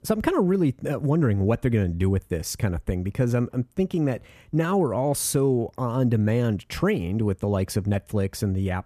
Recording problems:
none

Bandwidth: 14.5 kHz